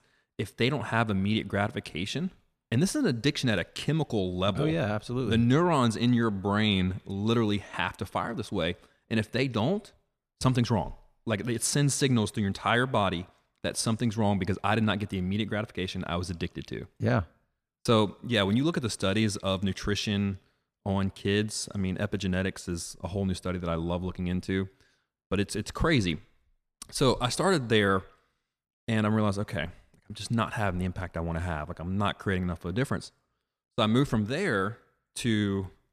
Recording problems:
none

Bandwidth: 14 kHz